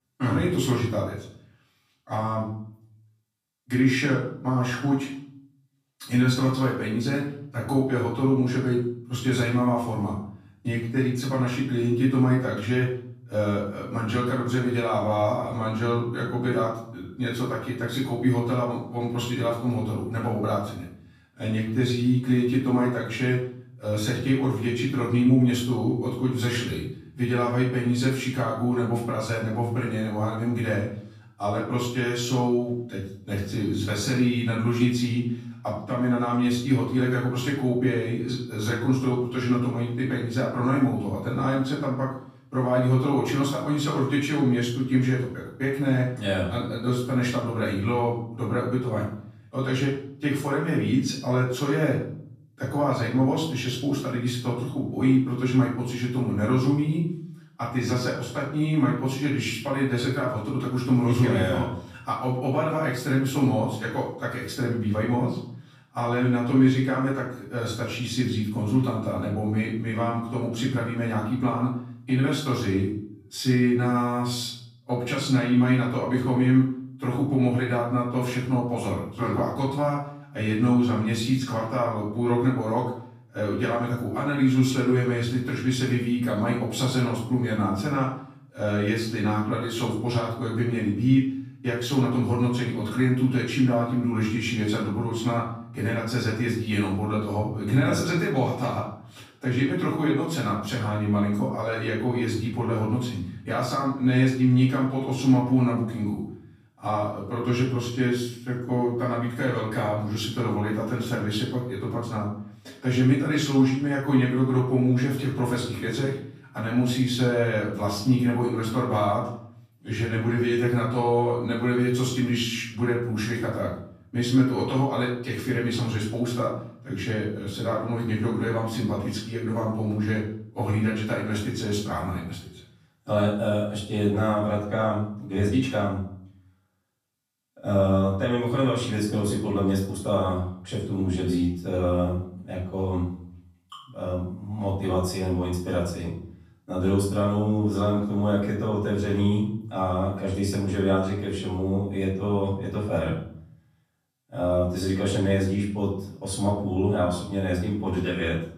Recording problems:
off-mic speech; far
room echo; noticeable; dies away in 0.5 s

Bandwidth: 14.5 kHz